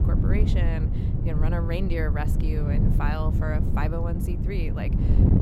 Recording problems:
wind noise on the microphone; heavy; 3 dB below the speech

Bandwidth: 16 kHz